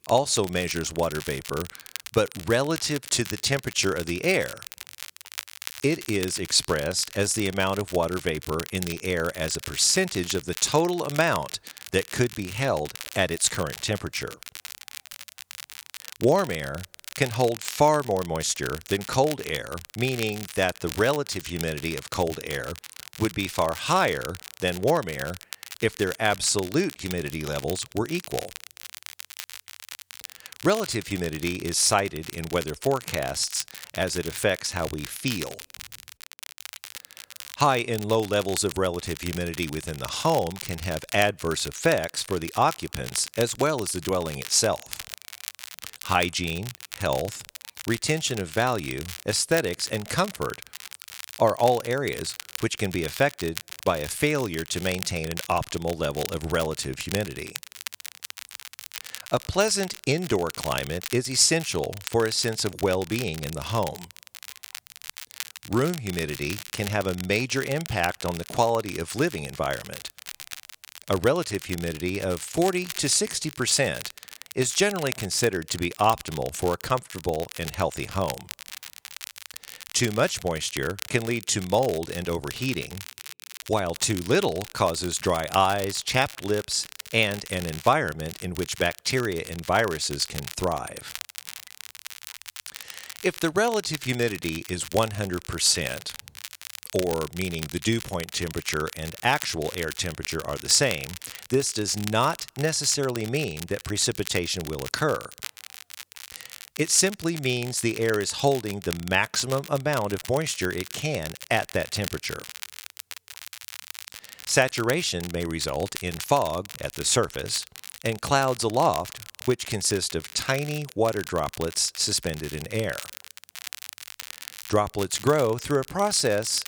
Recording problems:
crackle, like an old record; noticeable; 15 dB below the speech

